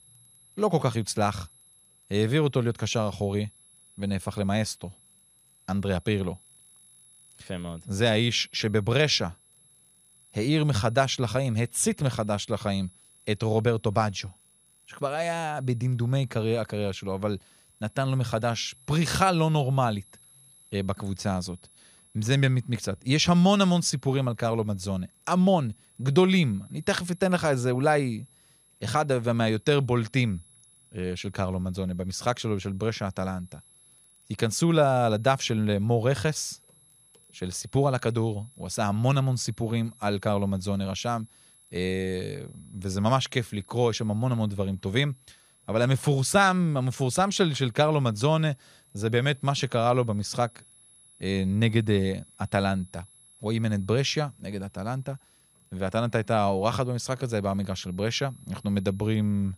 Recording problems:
high-pitched whine; faint; throughout; 11 kHz, 30 dB below the speech

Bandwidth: 14.5 kHz